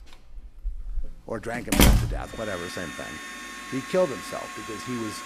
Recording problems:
household noises; very loud; throughout; 4 dB above the speech

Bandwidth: 14.5 kHz